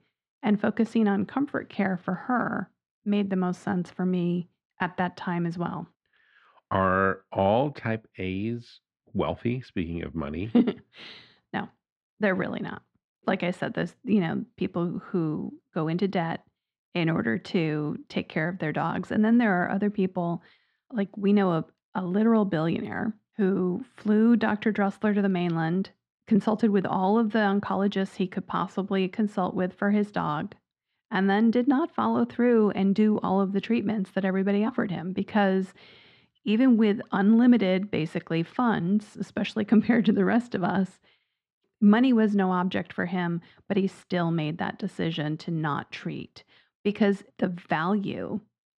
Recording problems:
muffled; slightly; fading above 2 kHz

